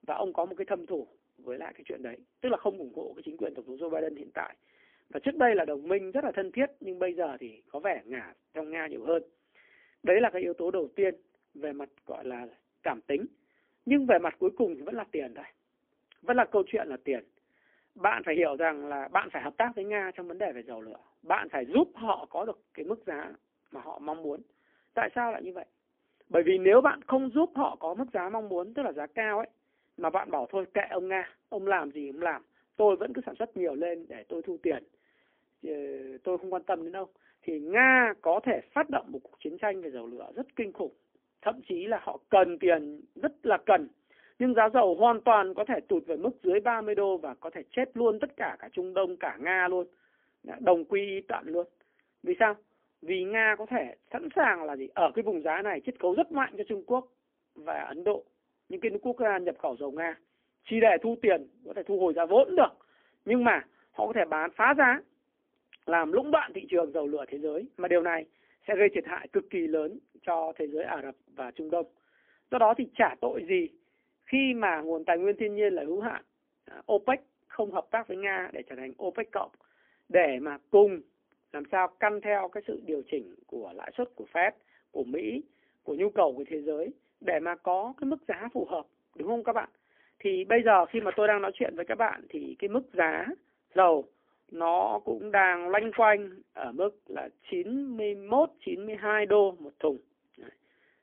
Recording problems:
phone-call audio; poor line

